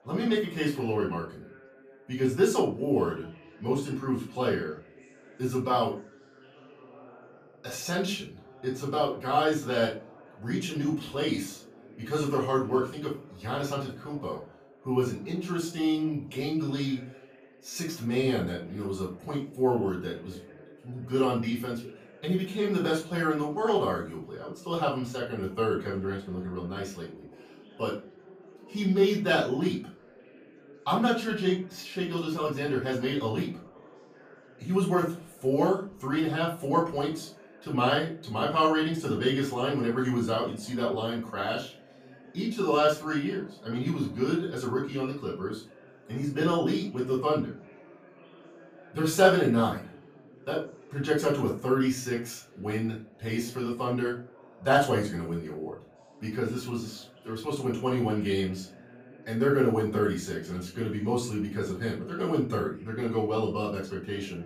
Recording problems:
off-mic speech; far
room echo; slight; dies away in 0.3 s
background chatter; faint; throughout; 4 voices, 25 dB below the speech

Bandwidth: 15 kHz